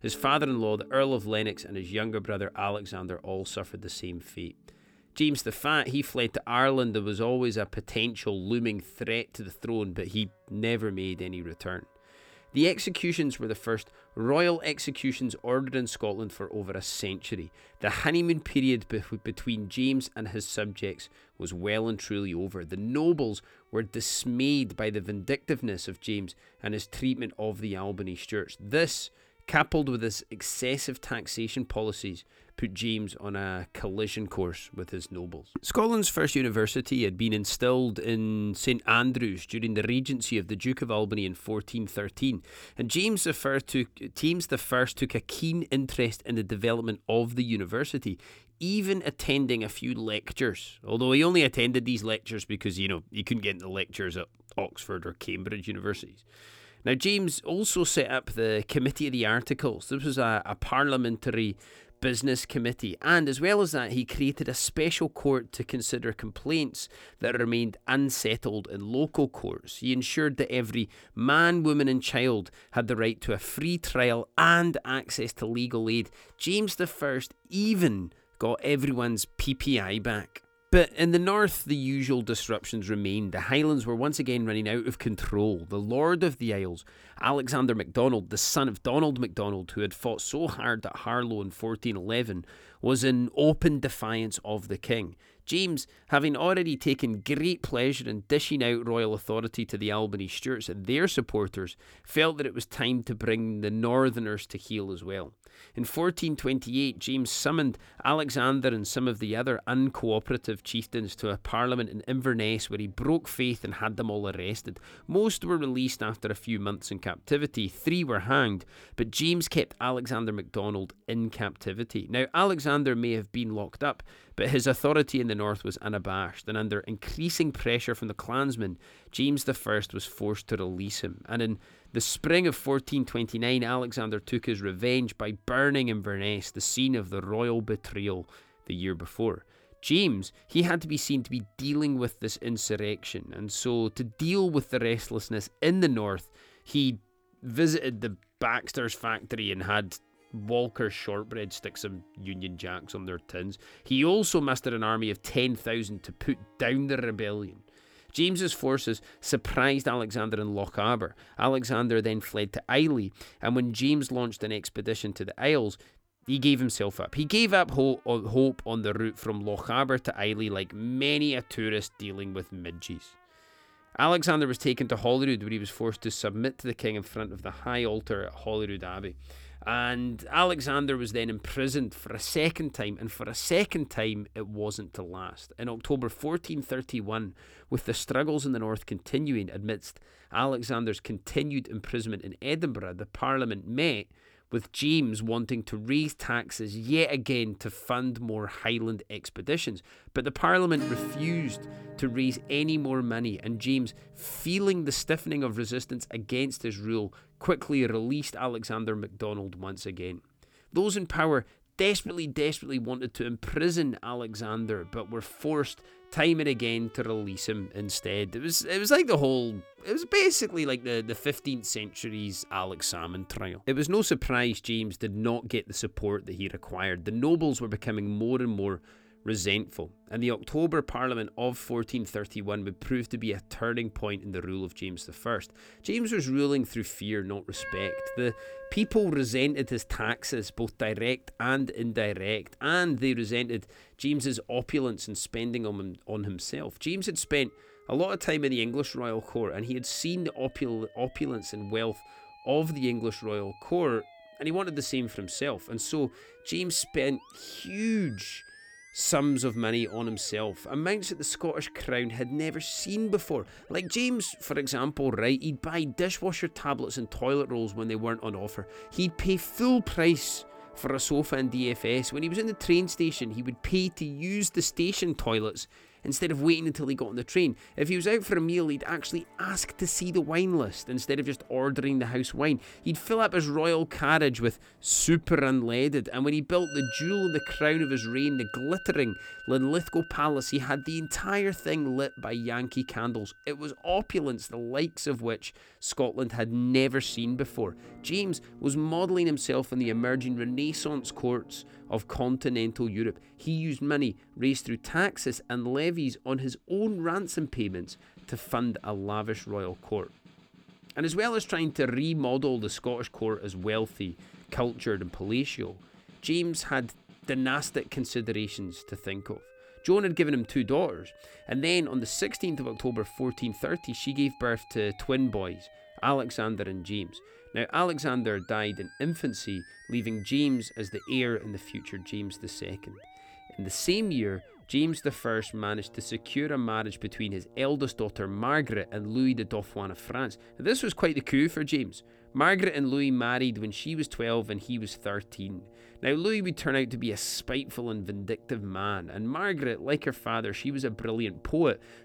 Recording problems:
background music; faint; throughout; 20 dB below the speech

